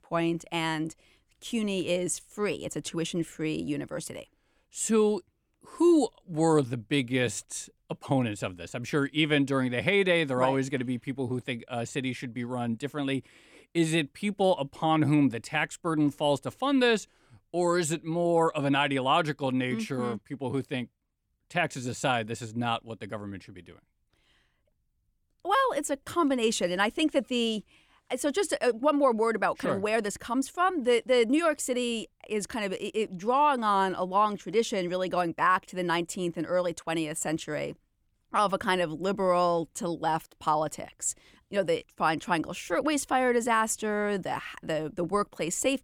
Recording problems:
none

